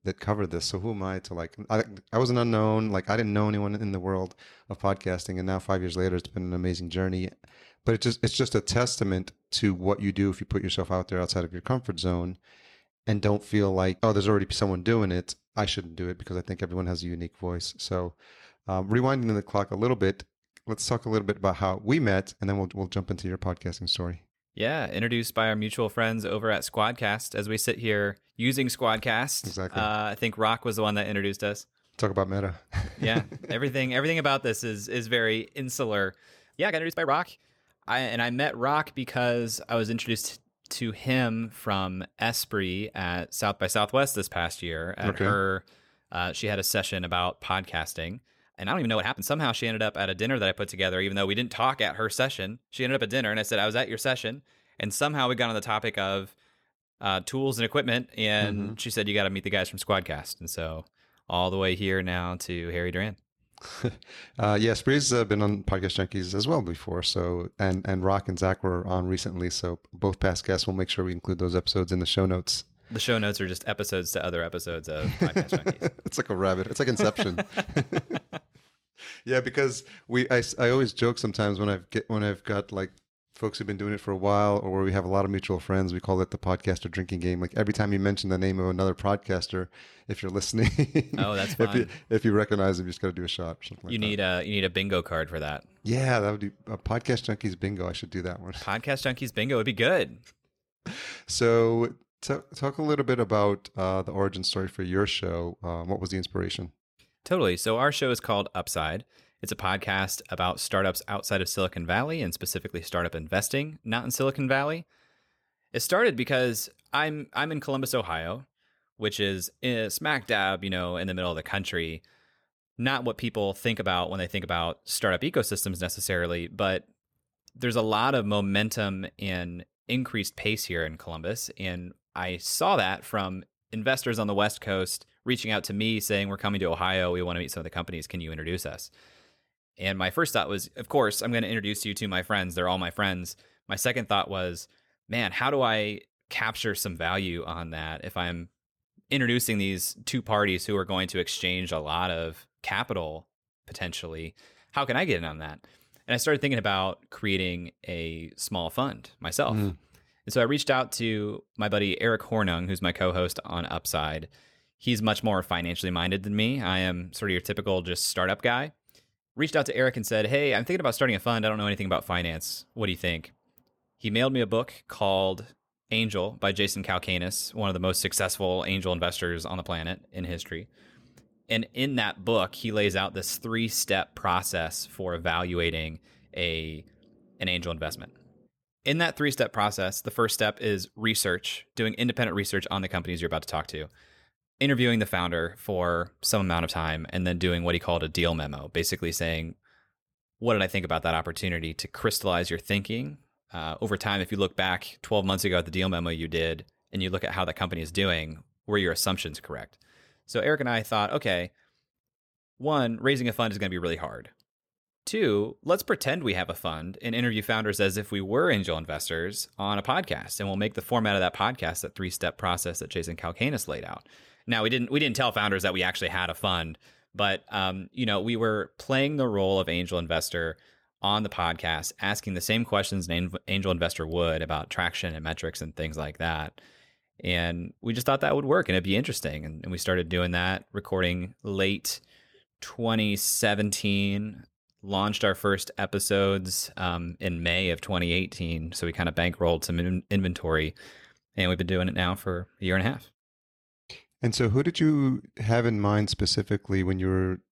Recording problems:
uneven, jittery; strongly; from 6 s to 3:23

